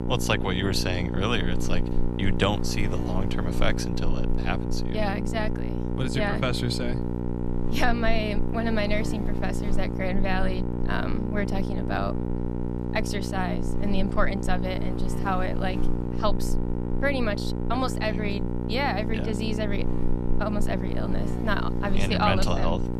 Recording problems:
electrical hum; loud; throughout; 60 Hz, 6 dB below the speech

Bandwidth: 13.5 kHz